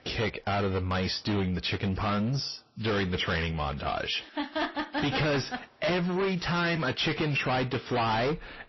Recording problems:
distortion; heavy; 6 dB below the speech
garbled, watery; slightly; nothing above 5.5 kHz

